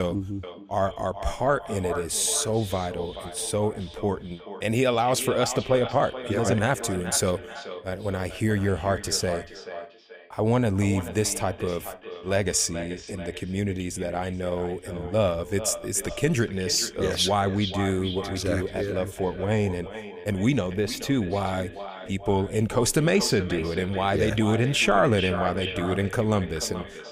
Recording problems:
echo of what is said; strong; throughout; 430 ms later, 10 dB below the speech
abrupt cut into speech; at the start

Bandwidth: 15.5 kHz